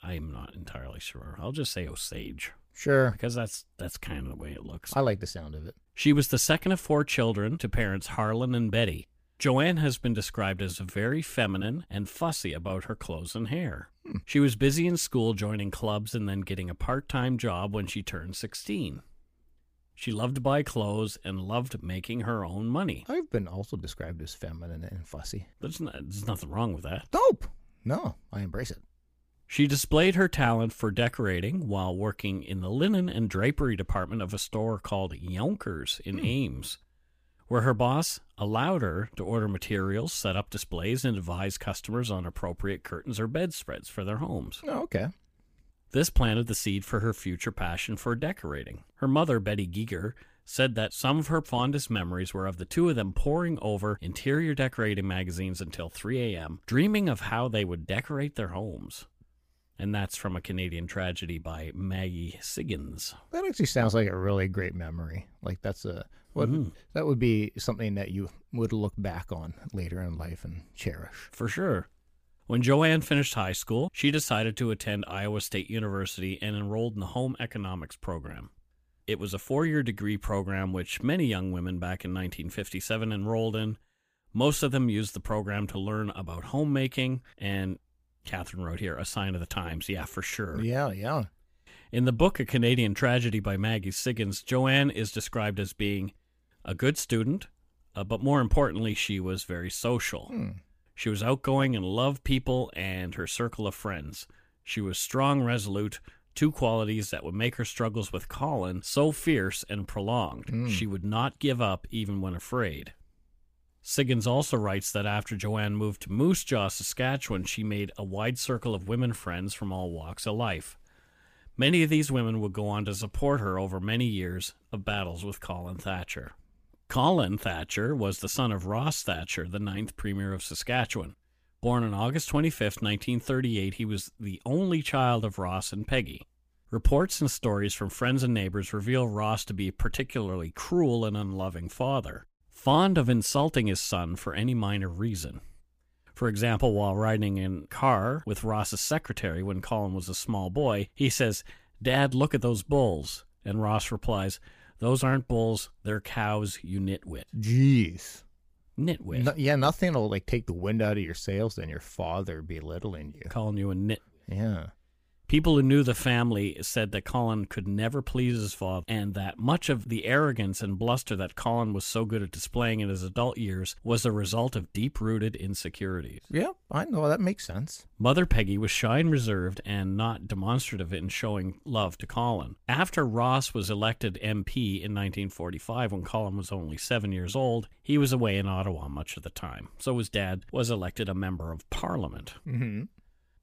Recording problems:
none

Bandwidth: 15 kHz